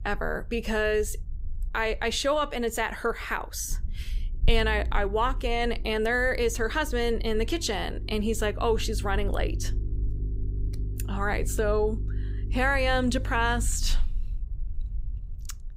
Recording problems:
low rumble; faint; throughout; 25 dB below the speech

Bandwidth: 15.5 kHz